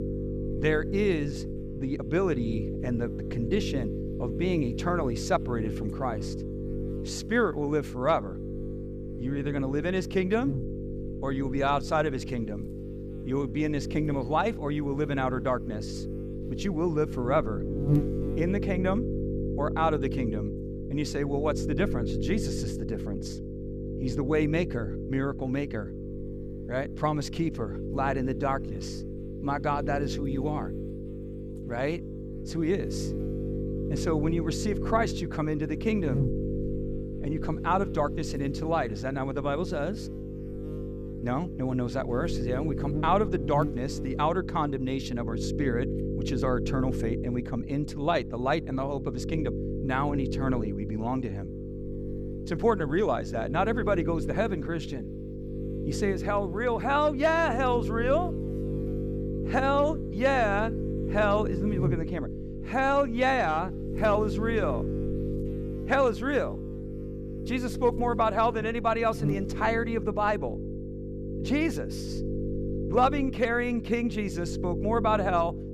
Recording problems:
electrical hum; loud; throughout; 50 Hz, 10 dB below the speech

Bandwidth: 14.5 kHz